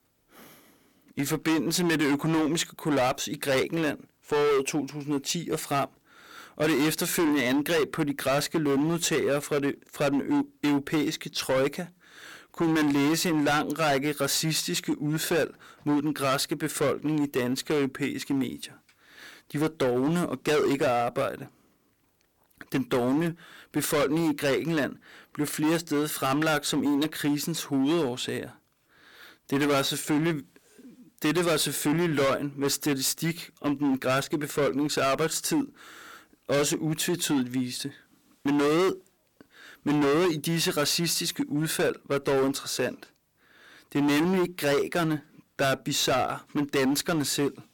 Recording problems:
distortion; heavy; 15% of the sound clipped

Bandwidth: 17.5 kHz